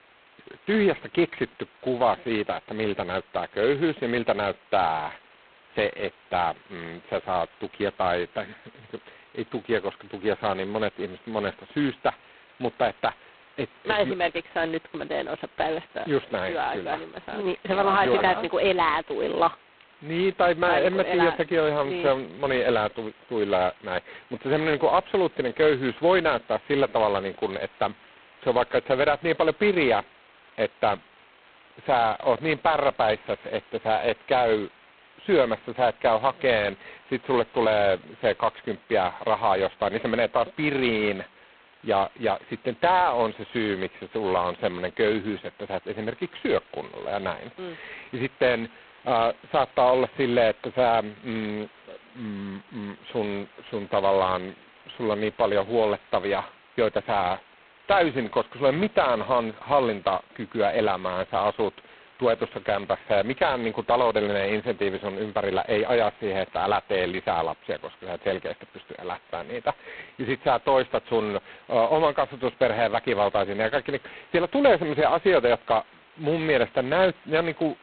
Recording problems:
phone-call audio; poor line; nothing above 4 kHz
hiss; faint; throughout; 30 dB below the speech

